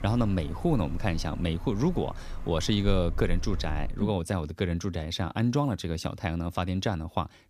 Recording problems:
wind in the background; noticeable; until 4 s; 10 dB below the speech

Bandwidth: 15 kHz